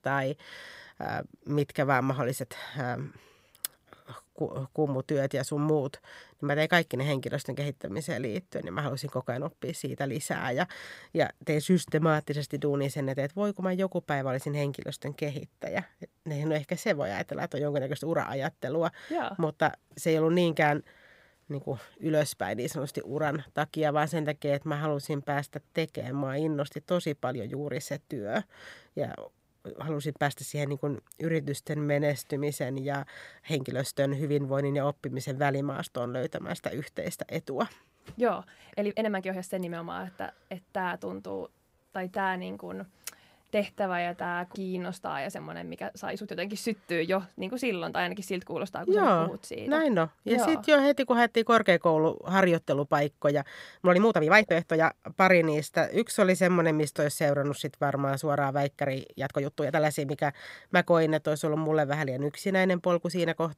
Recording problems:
uneven, jittery; strongly; from 4.5 s to 1:00

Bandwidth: 15.5 kHz